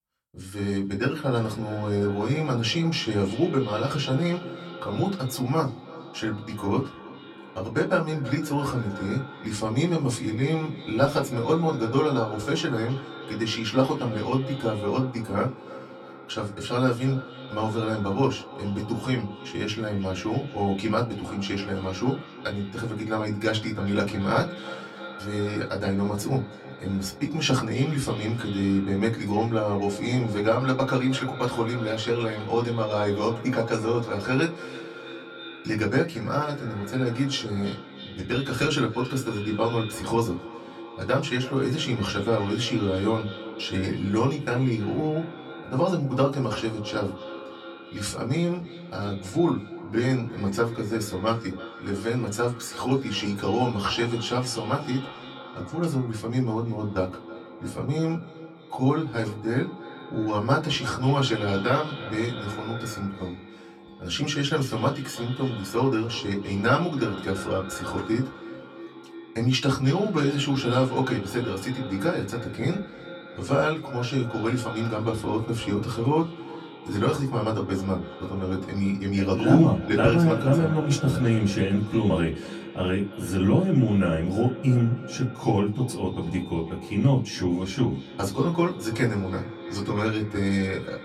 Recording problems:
off-mic speech; far
echo of what is said; noticeable; throughout; 320 ms later, 15 dB below the speech
room echo; very slight; dies away in 0.2 s

